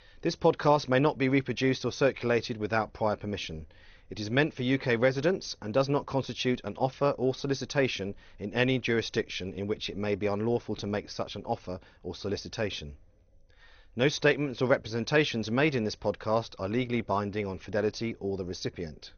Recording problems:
garbled, watery; slightly; nothing above 6.5 kHz

